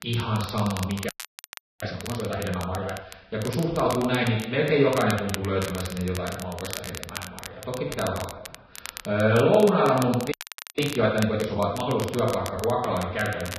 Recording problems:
off-mic speech; far
garbled, watery; badly; nothing above 5.5 kHz
room echo; noticeable; dies away in 1 s
crackle, like an old record; noticeable; 15 dB below the speech
audio freezing; at 1 s for 0.5 s and at 10 s

